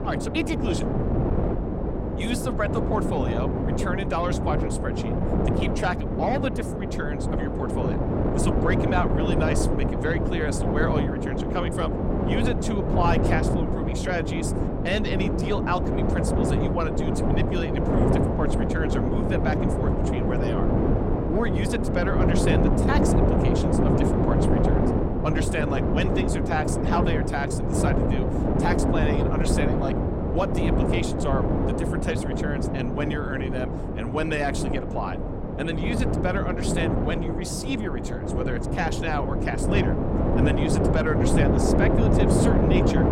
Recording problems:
wind noise on the microphone; heavy; 1 dB above the speech

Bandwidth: 16.5 kHz